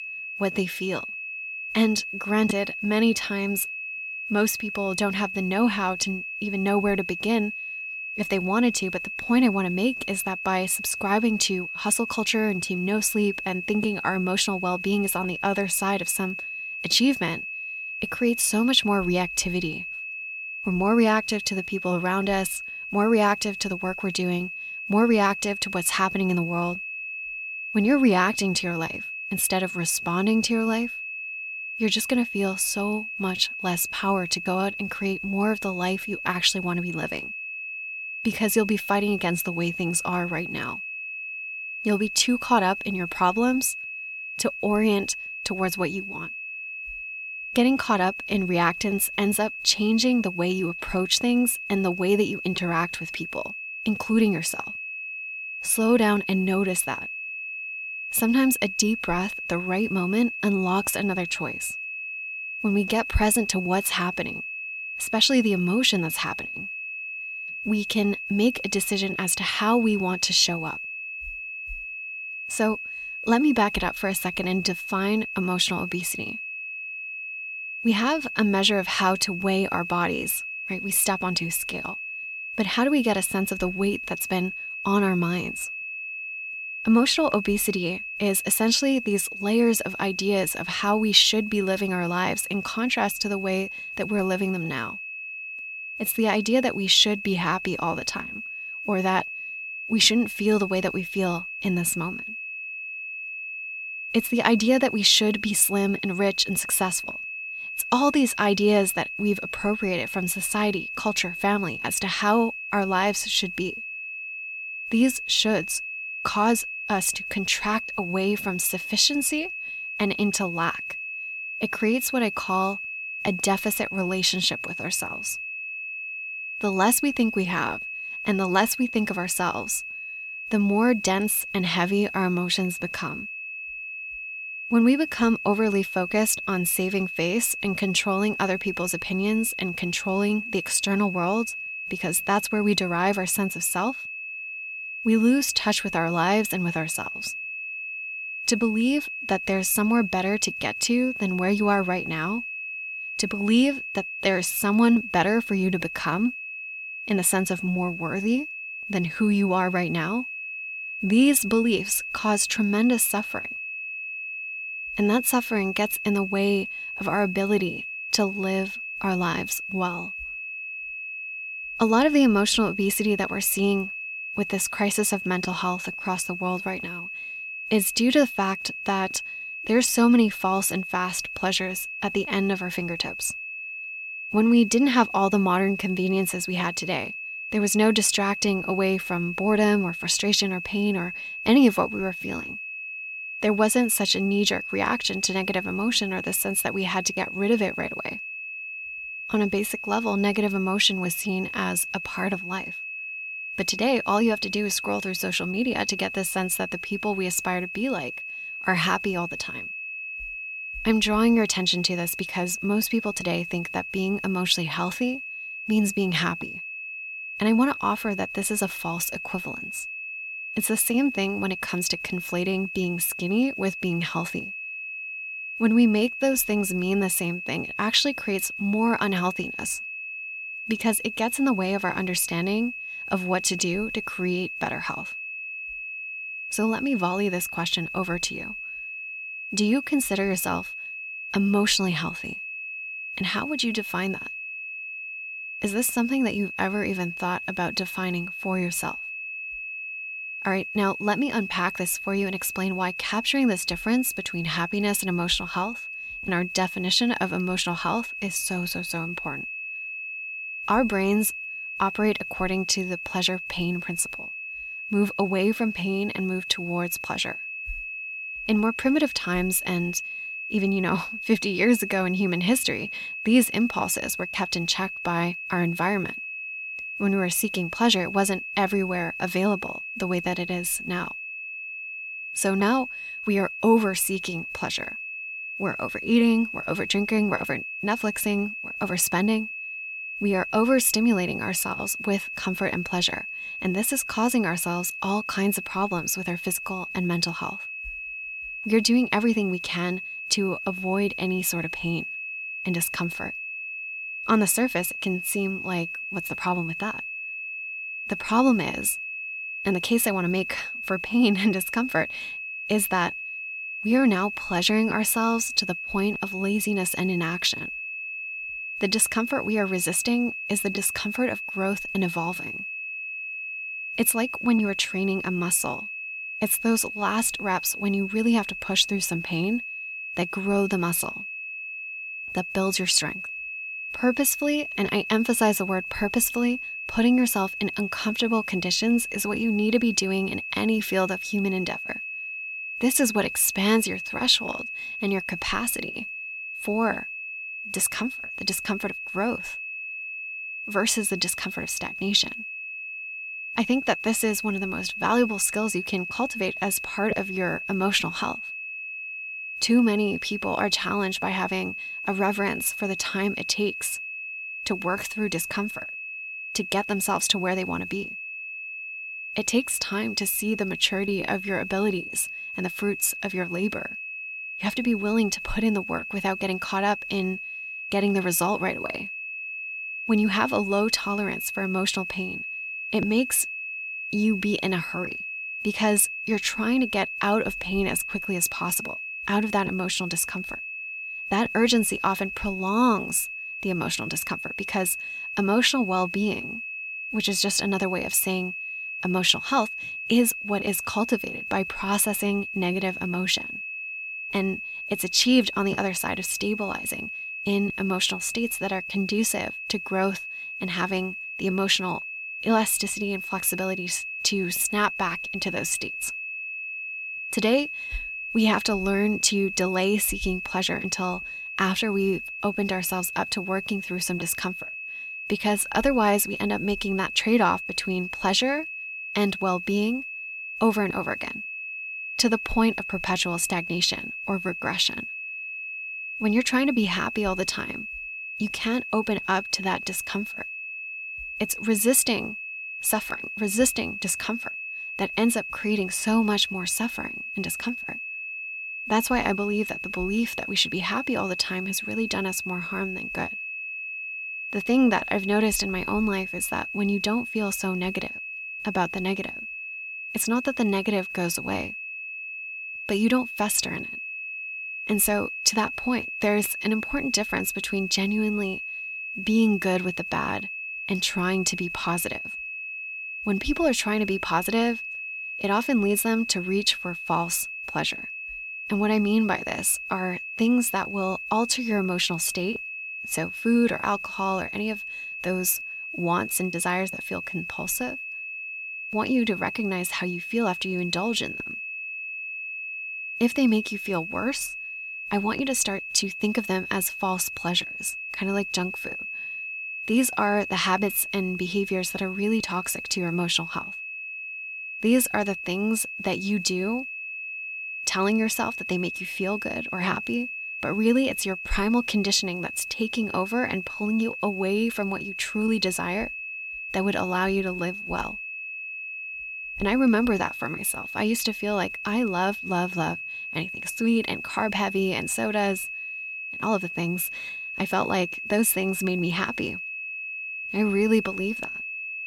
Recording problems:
high-pitched whine; loud; throughout; 2.5 kHz, 7 dB below the speech

